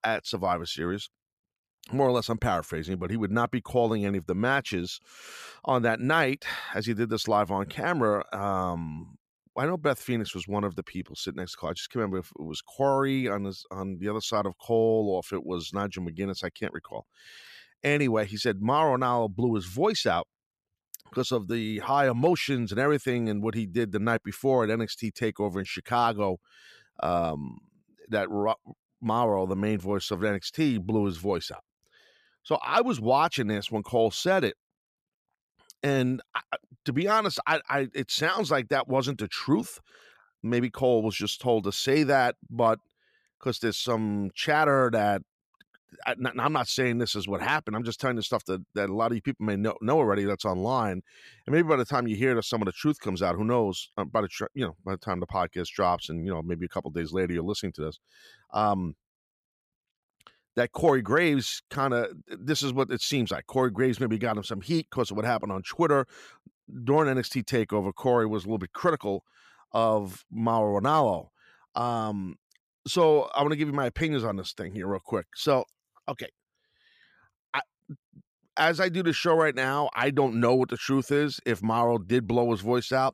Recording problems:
none

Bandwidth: 14.5 kHz